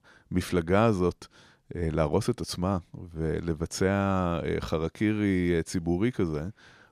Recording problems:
none

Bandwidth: 14 kHz